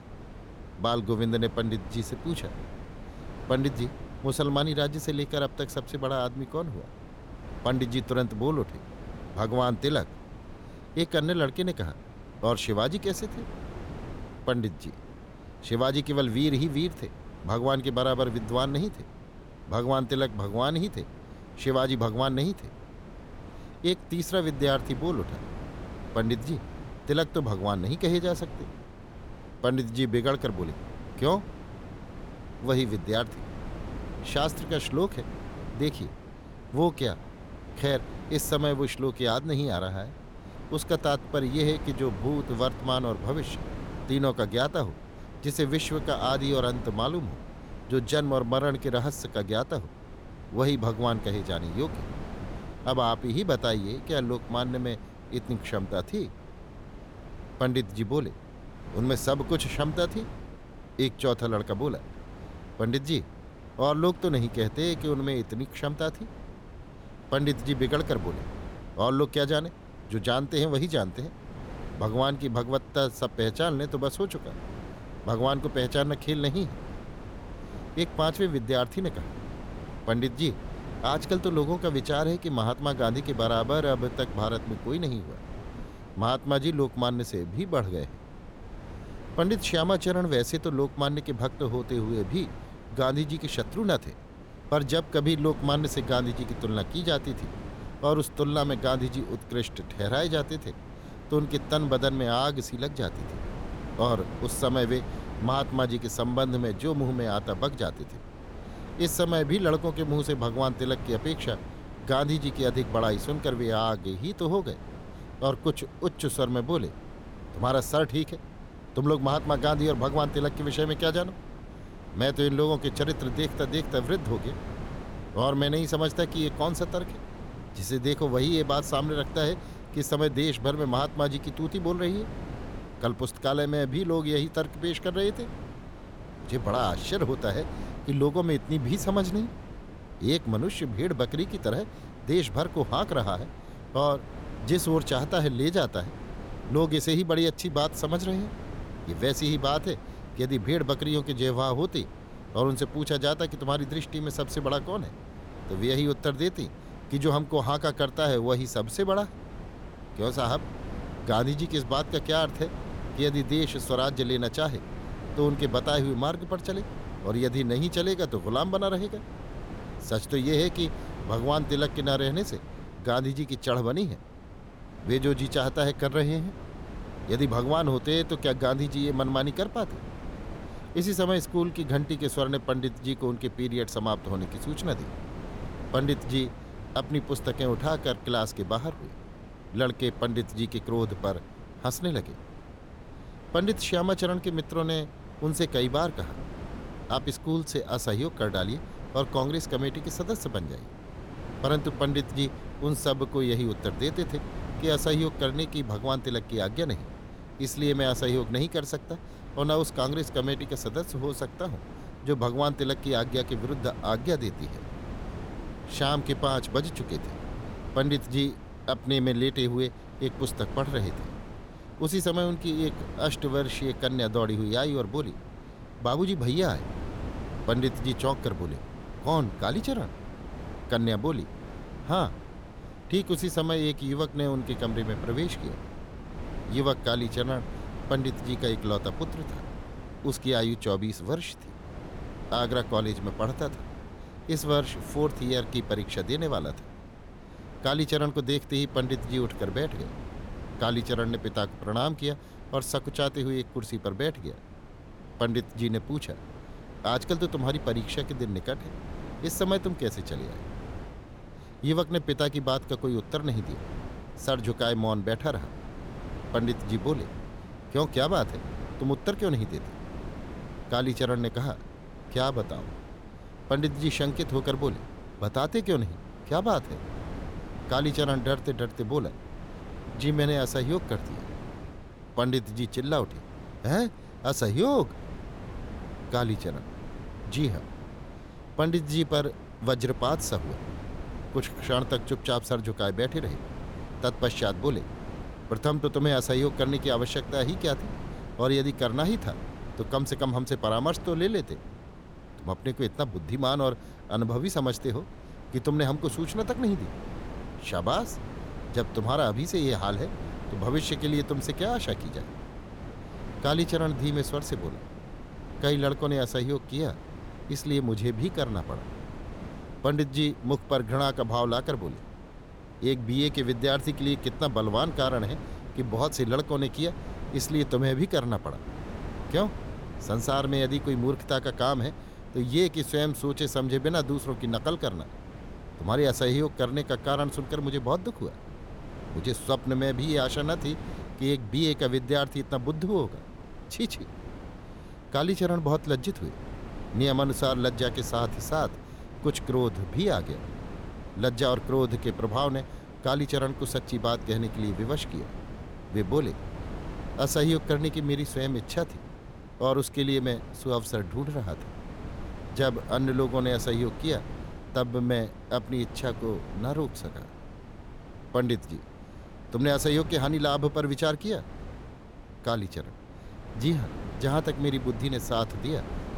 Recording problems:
wind noise on the microphone; occasional gusts; 15 dB below the speech

